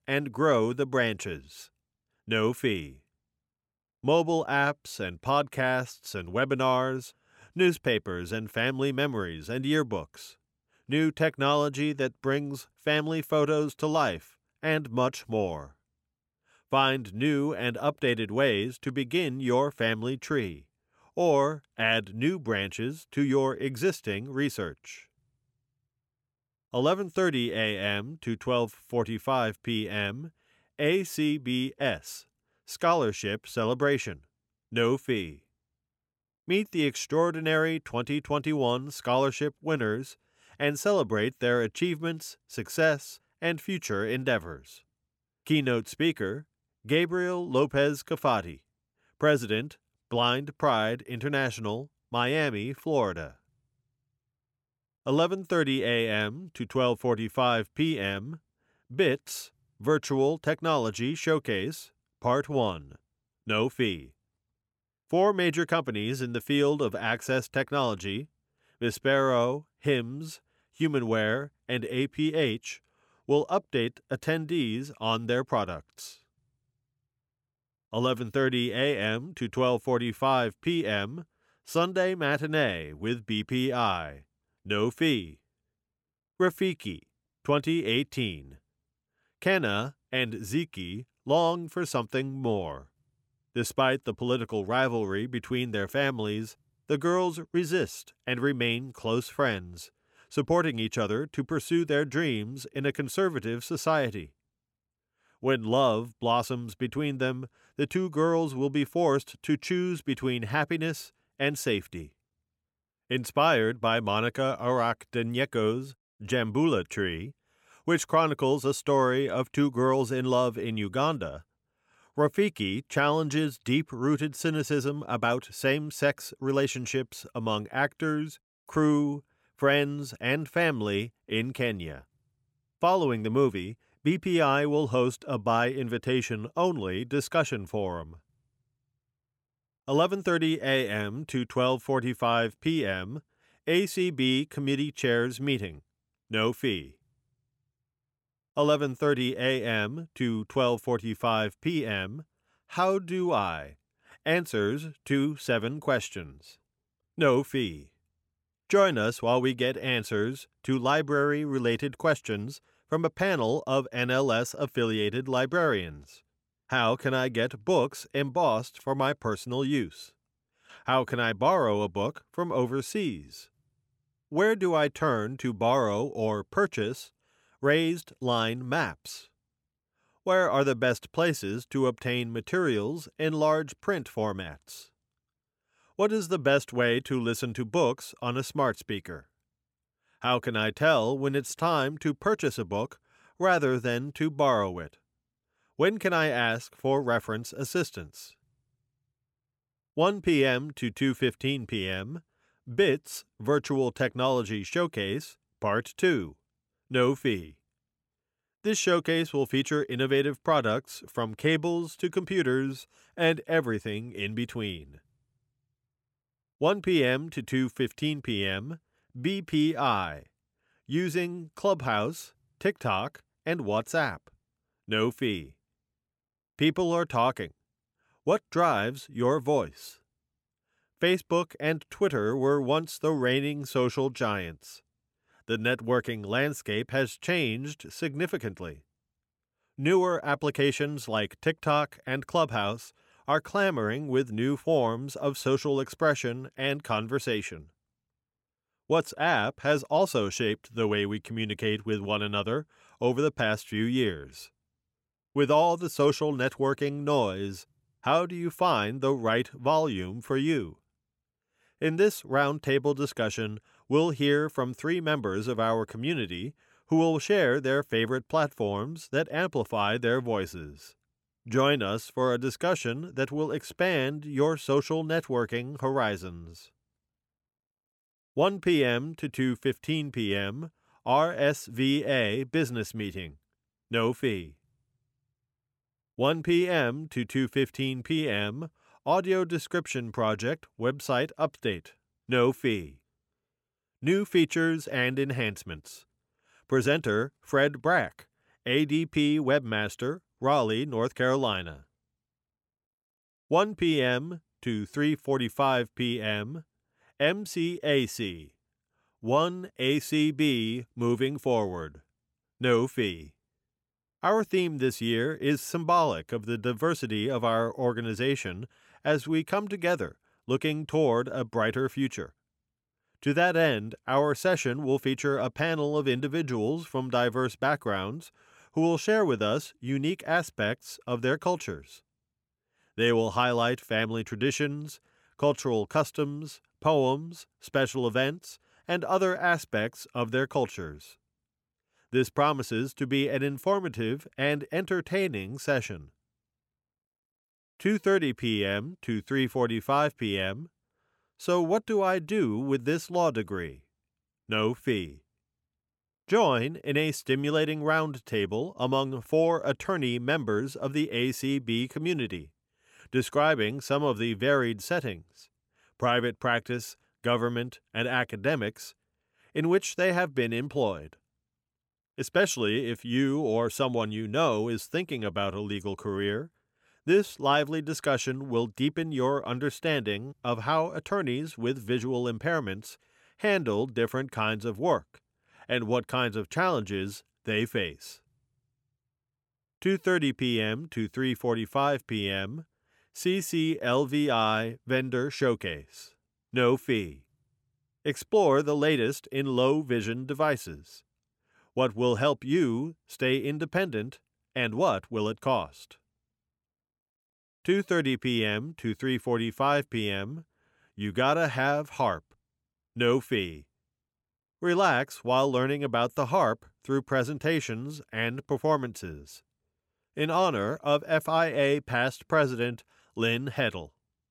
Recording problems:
none

